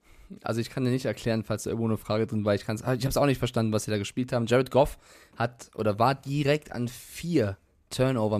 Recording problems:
abrupt cut into speech; at the end

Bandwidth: 14.5 kHz